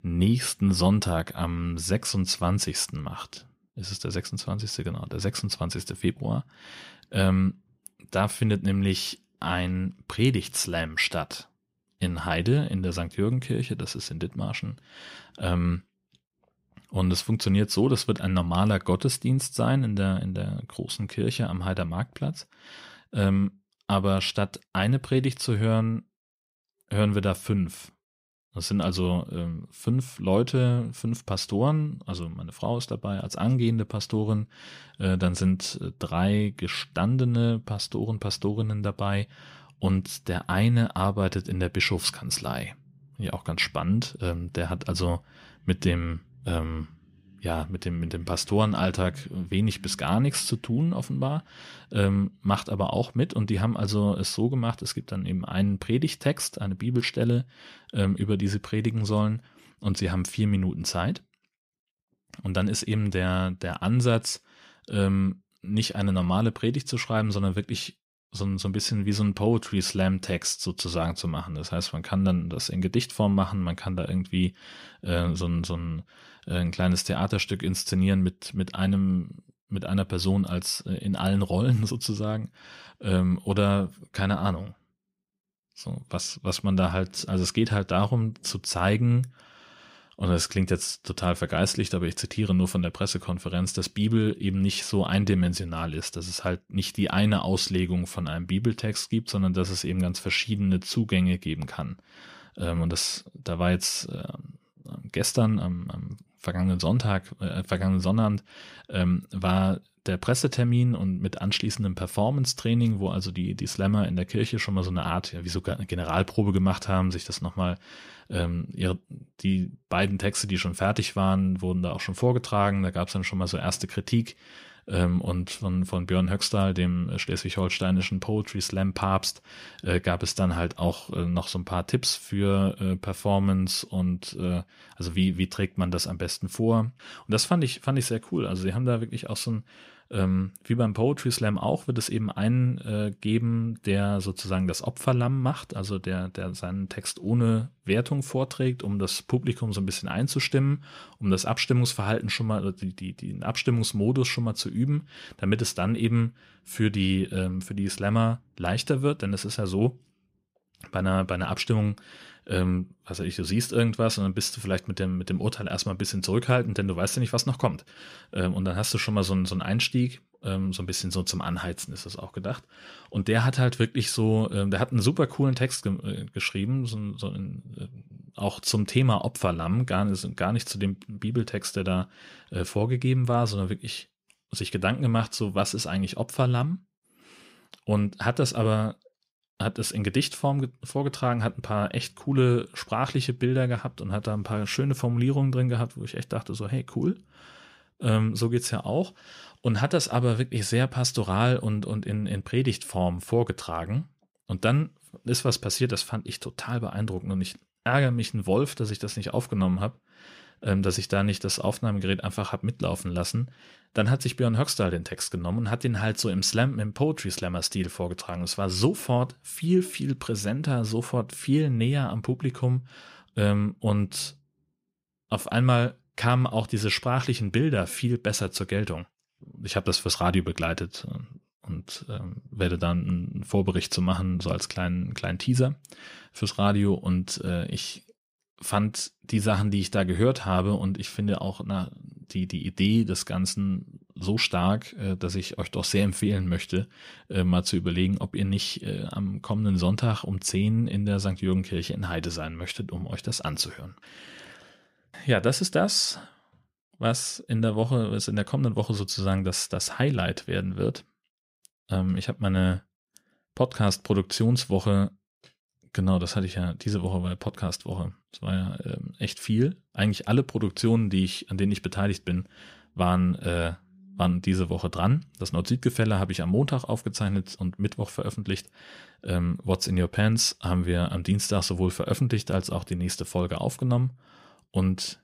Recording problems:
none

